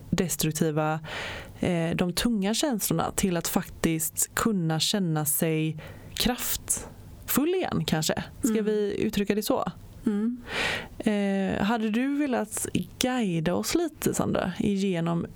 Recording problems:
squashed, flat; heavily

